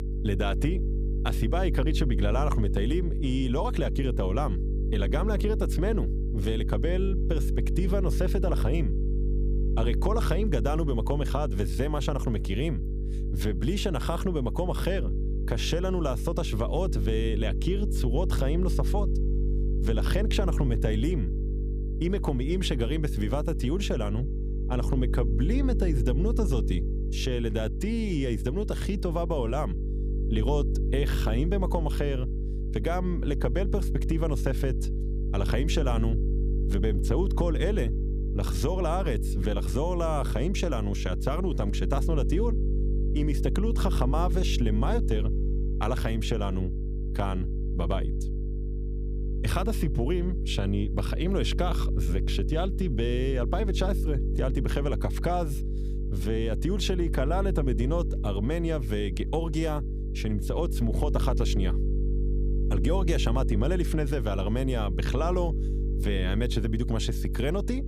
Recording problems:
electrical hum; loud; throughout; 50 Hz, 9 dB below the speech

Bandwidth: 15 kHz